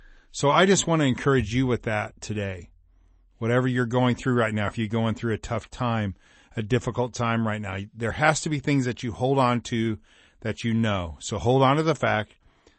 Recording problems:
garbled, watery; slightly; nothing above 8 kHz

